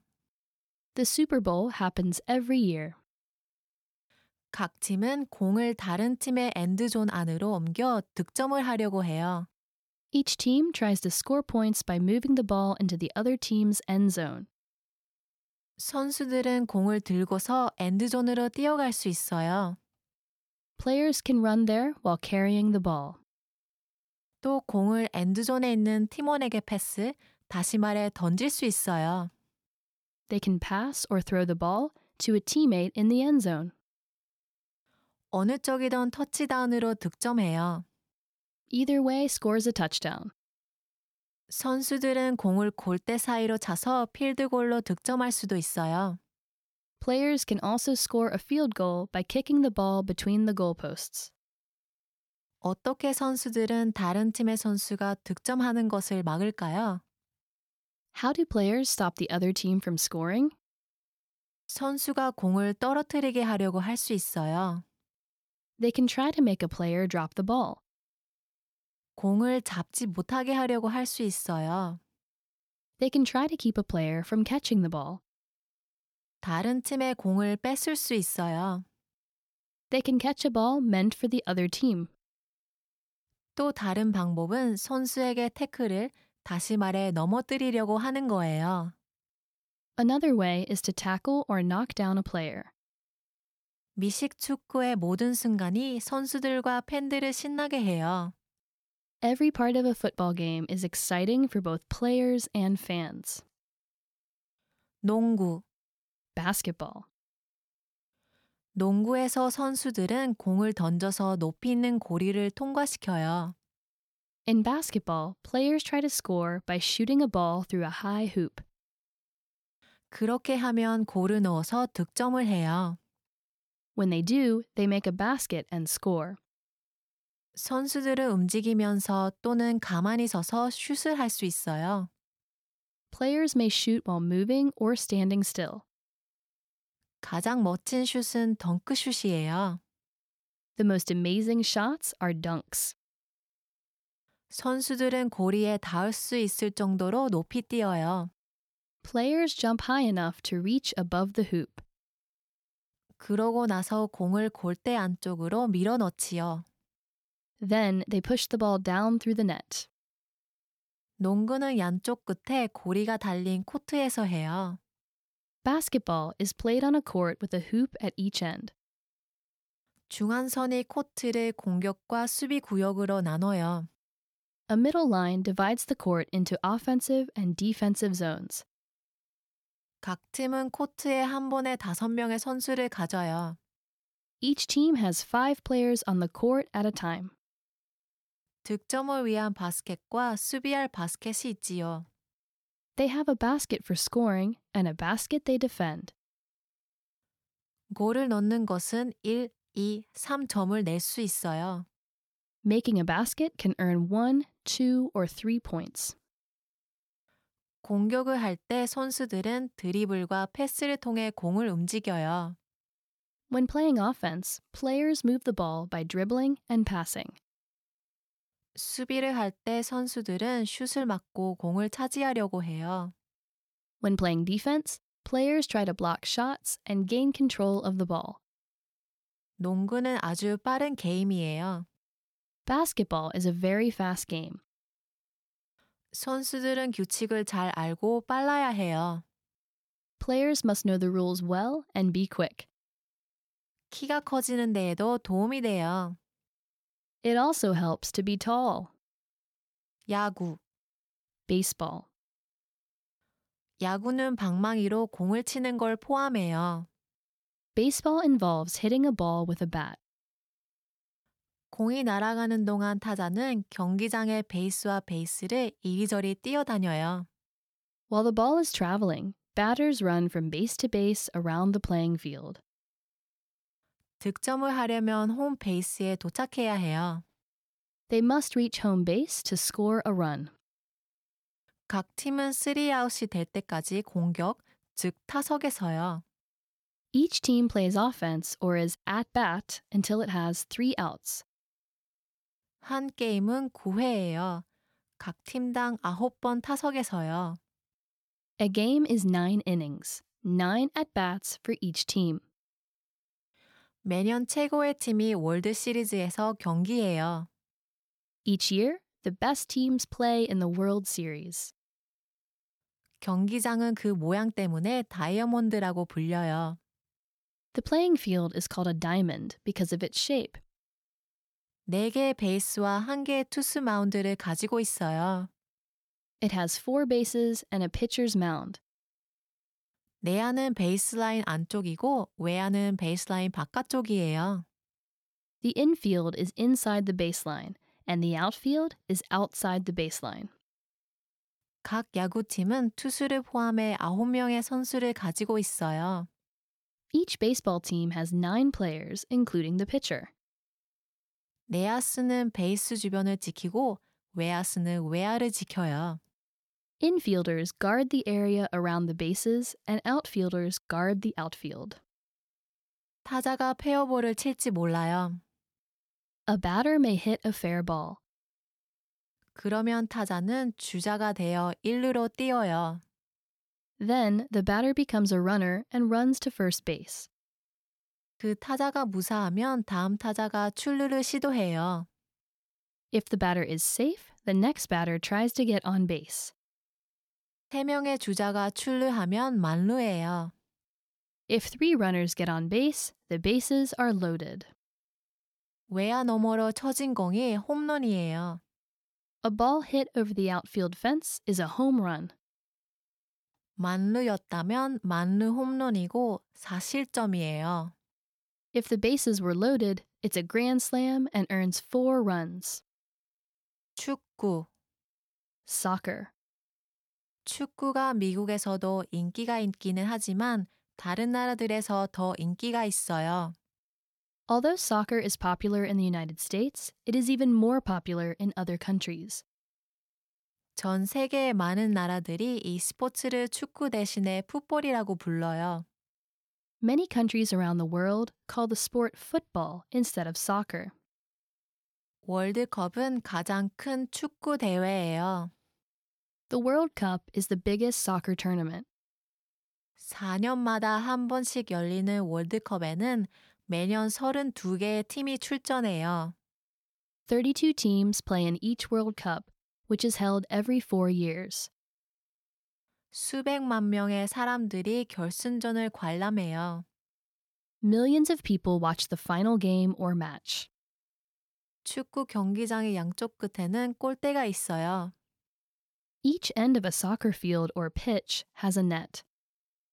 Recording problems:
none

